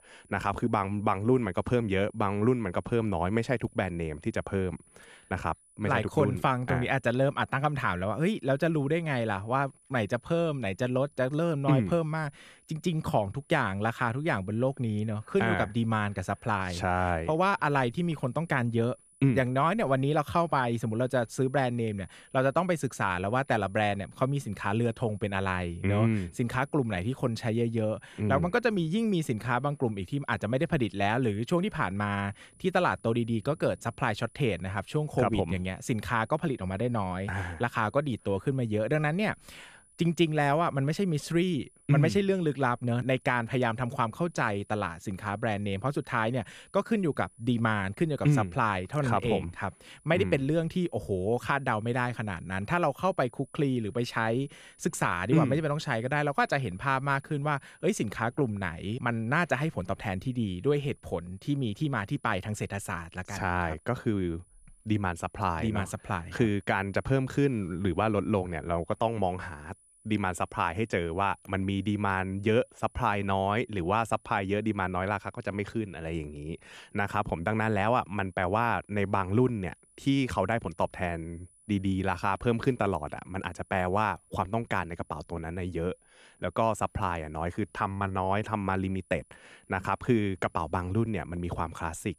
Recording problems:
high-pitched whine; faint; throughout; 10 kHz, 30 dB below the speech

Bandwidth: 14.5 kHz